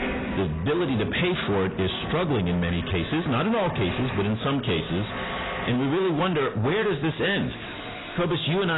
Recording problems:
distortion; heavy; 5 dB below the speech
garbled, watery; badly; nothing above 4 kHz
squashed, flat; somewhat, background pumping
household noises; loud; throughout; 10 dB below the speech
abrupt cut into speech; at the end

